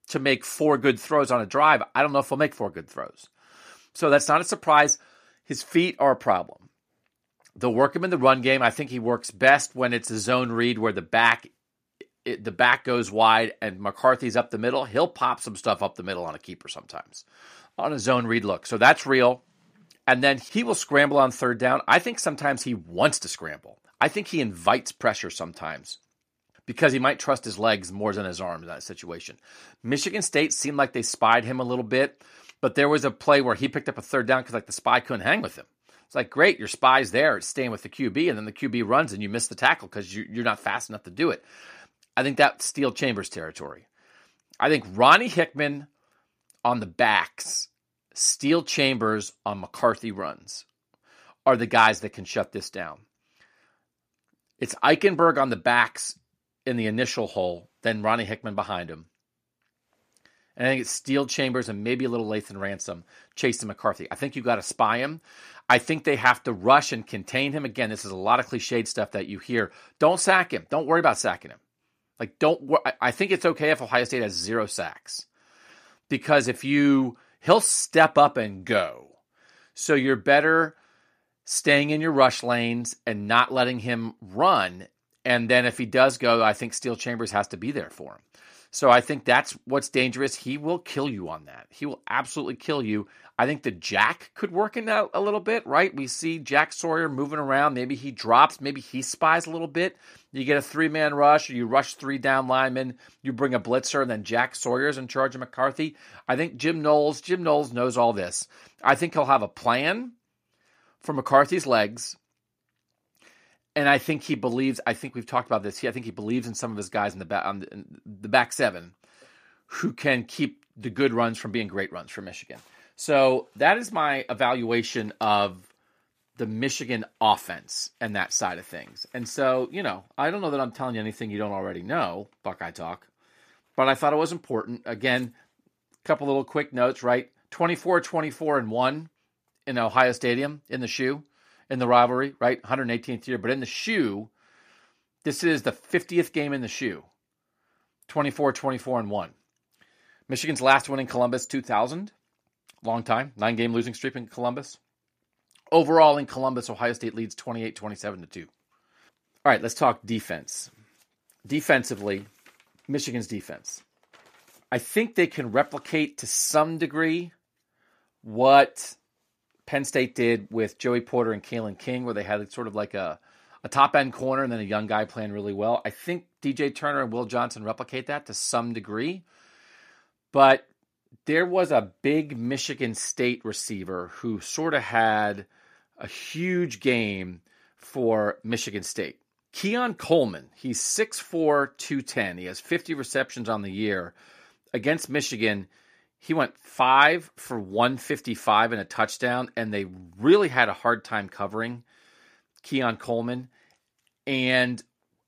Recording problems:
none

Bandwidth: 14.5 kHz